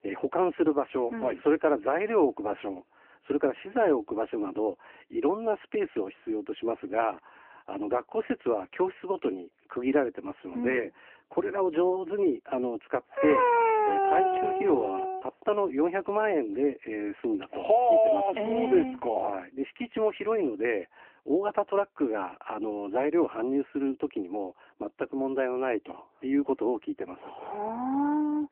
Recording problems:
phone-call audio
dog barking; loud; from 13 to 15 s; peak 6 dB above the speech

